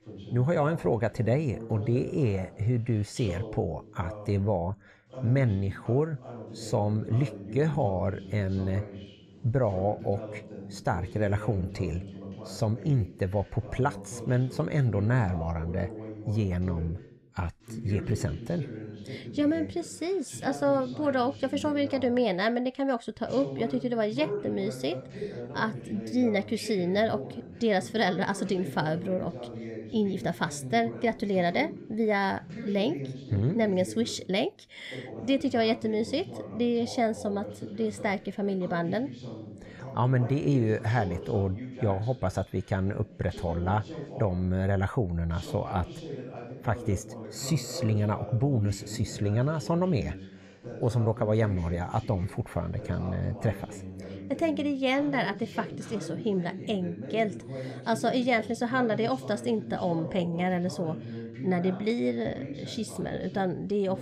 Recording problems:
voice in the background; noticeable; throughout; 10 dB below the speech

